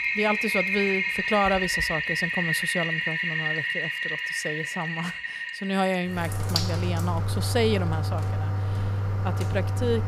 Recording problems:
household noises; very loud; throughout; 3 dB above the speech

